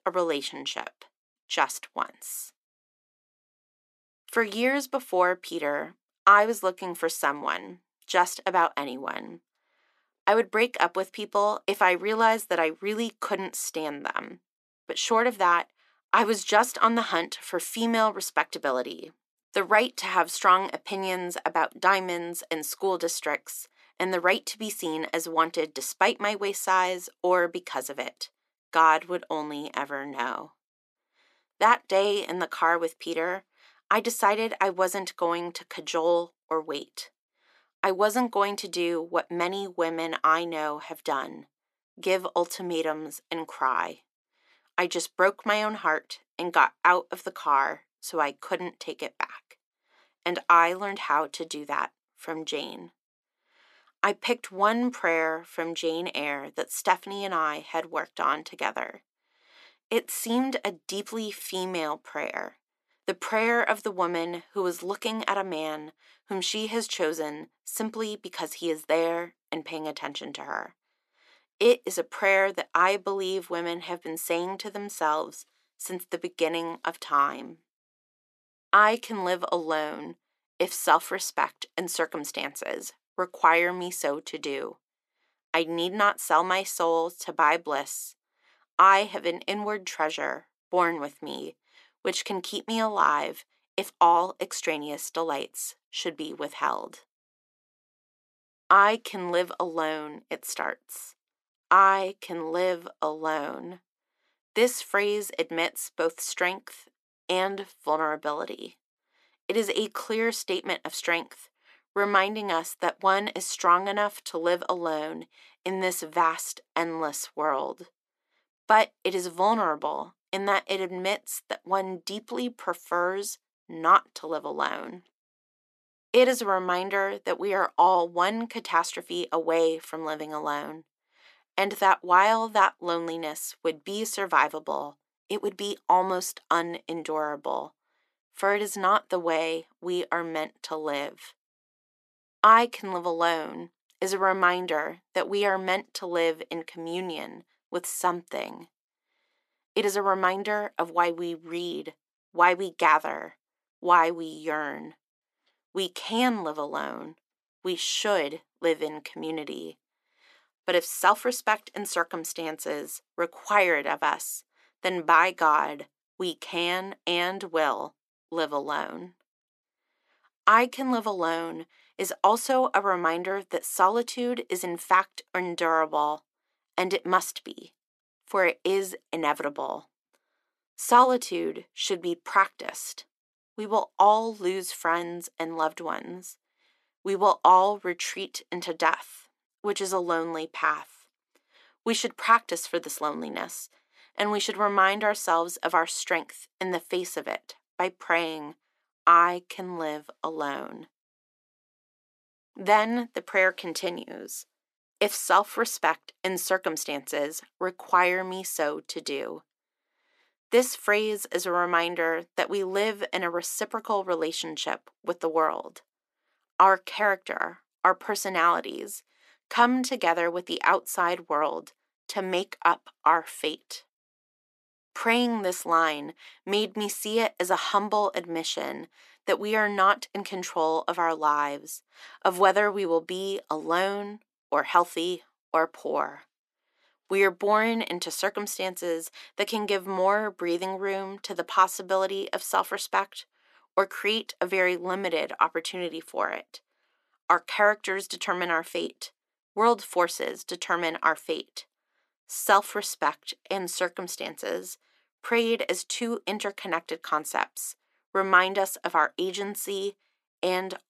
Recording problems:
thin; somewhat; fading below 300 Hz

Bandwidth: 13.5 kHz